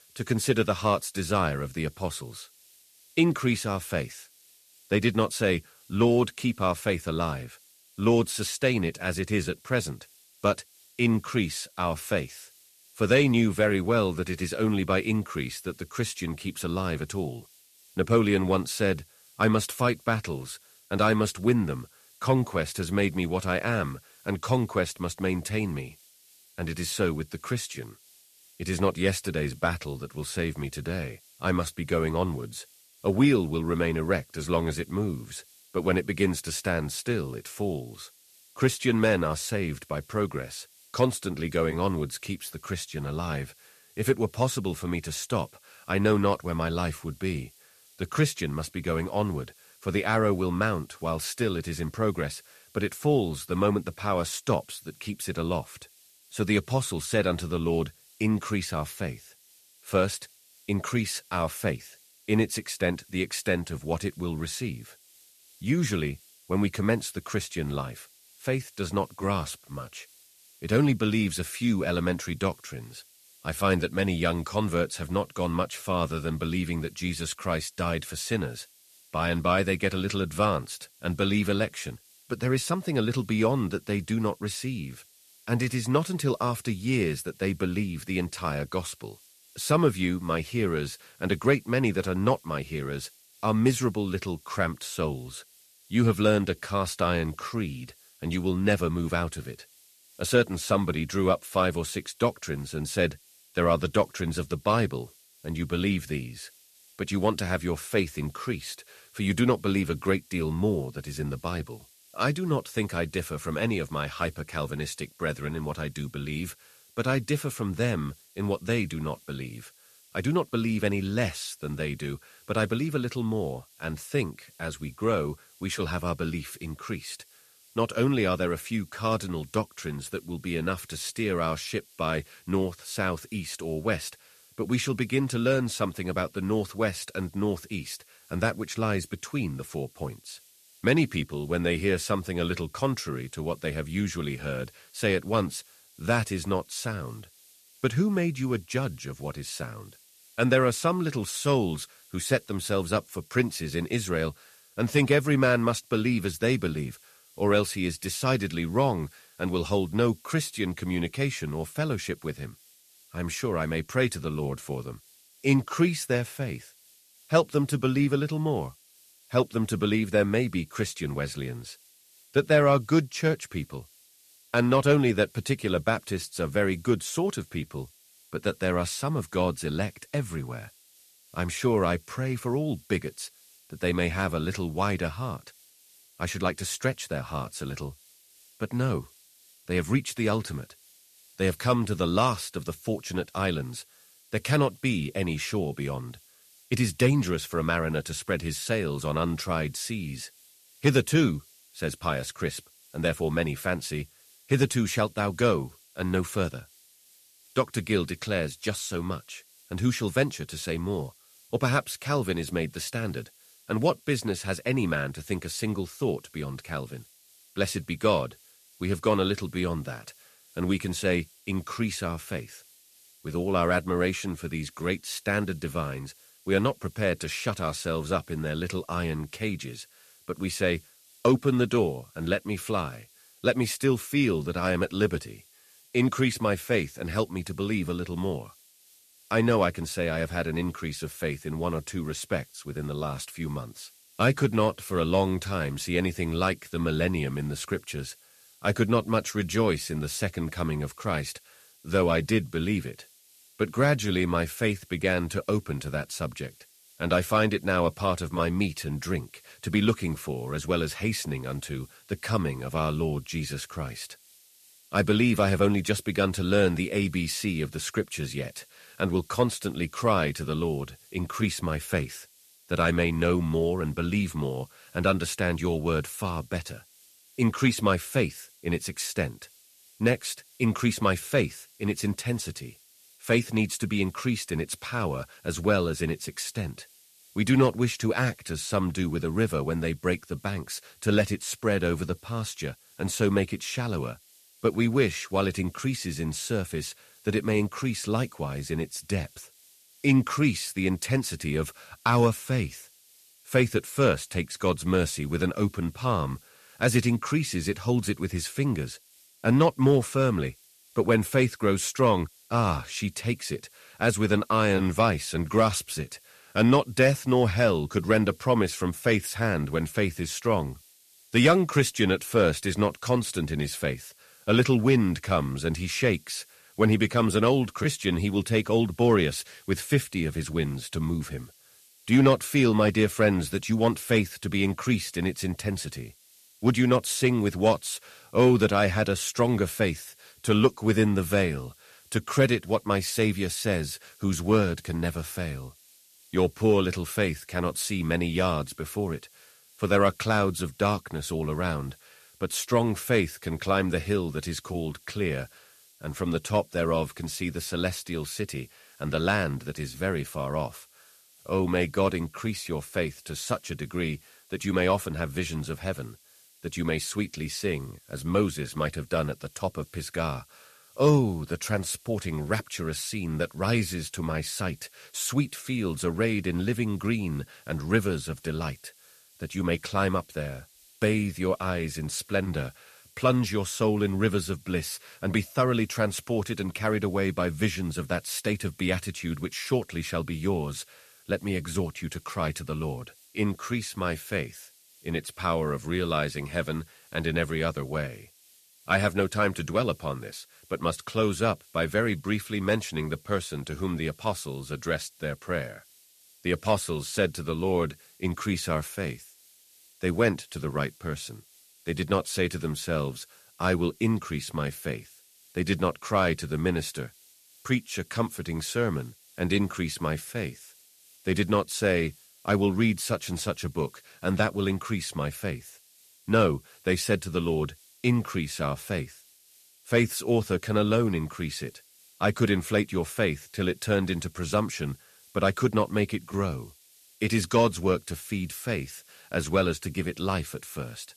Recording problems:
hiss; faint; throughout; 25 dB below the speech

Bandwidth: 14 kHz